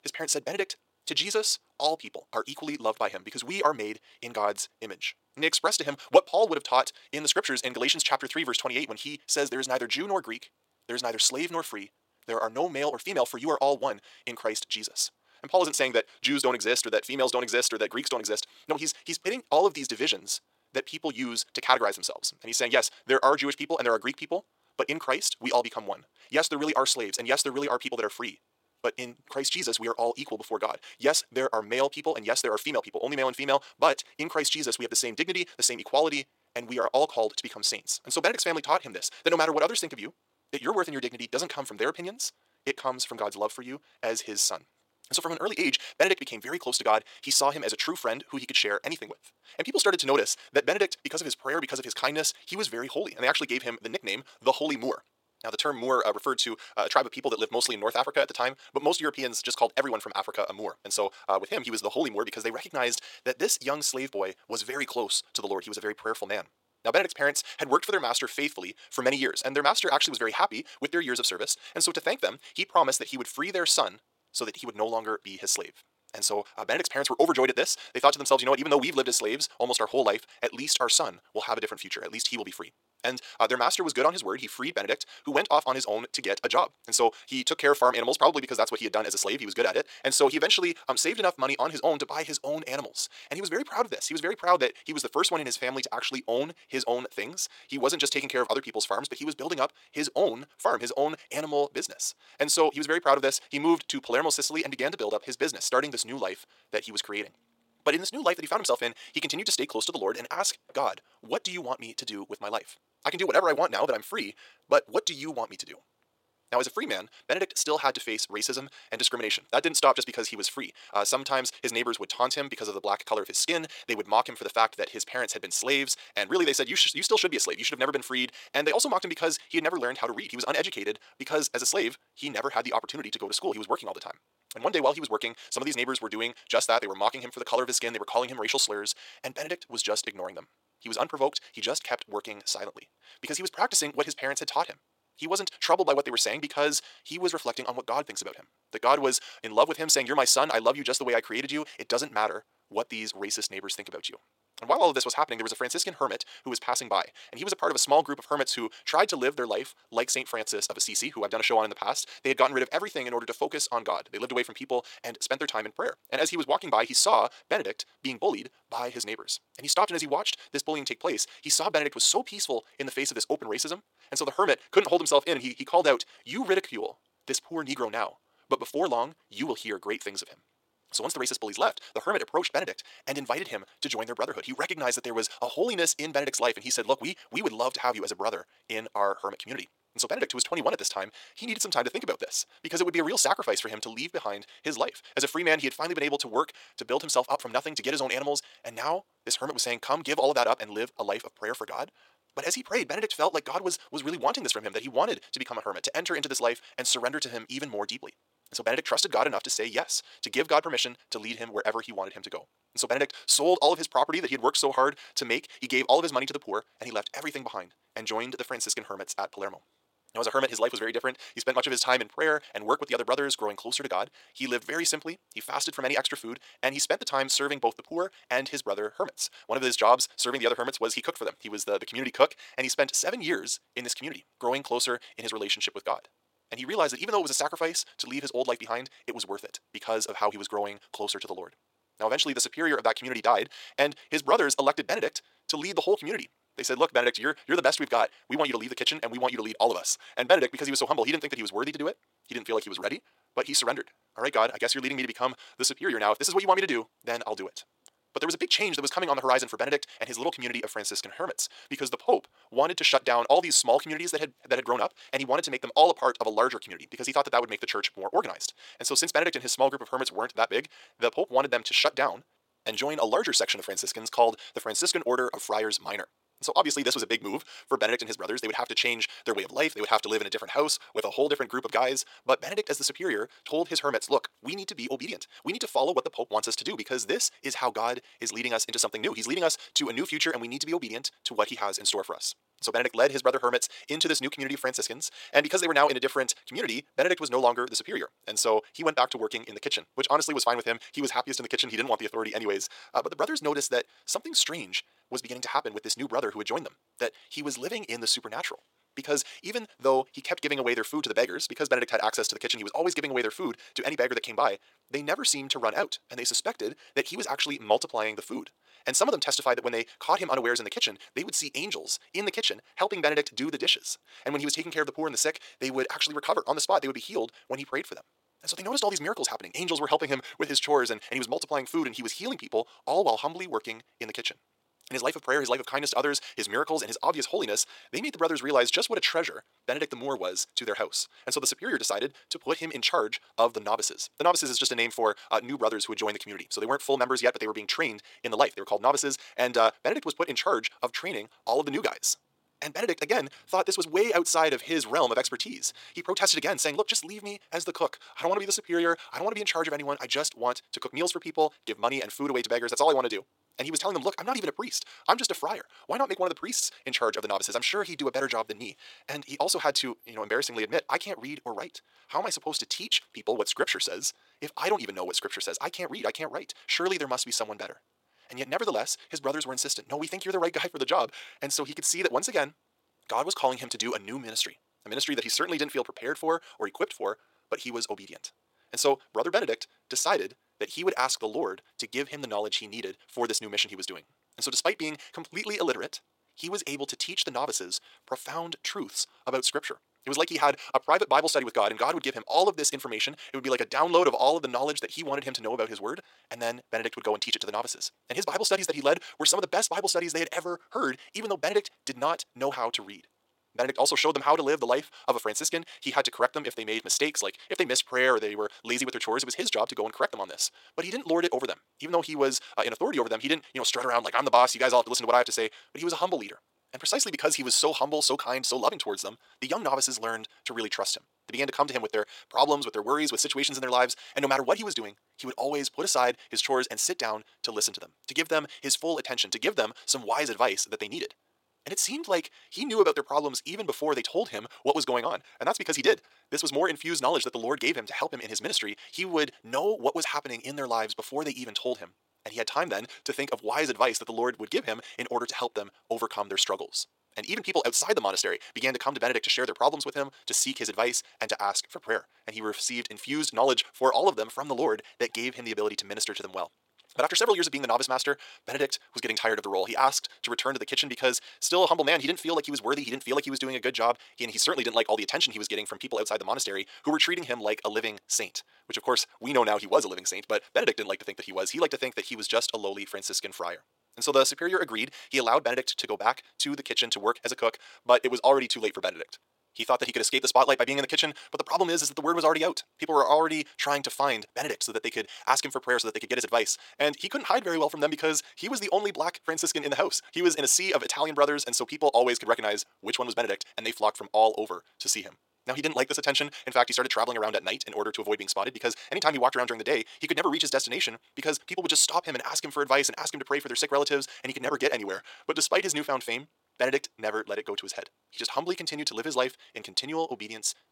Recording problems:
wrong speed, natural pitch; too fast; 1.7 times normal speed
thin; somewhat; fading below 550 Hz

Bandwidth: 16.5 kHz